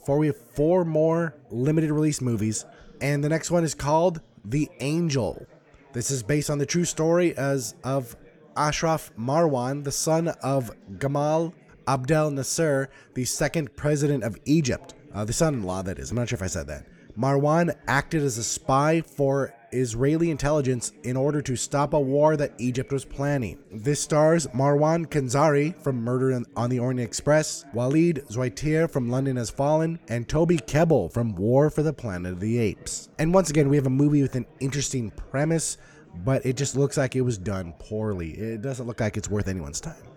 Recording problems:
background chatter; faint; throughout; 4 voices, 25 dB below the speech

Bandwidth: 18 kHz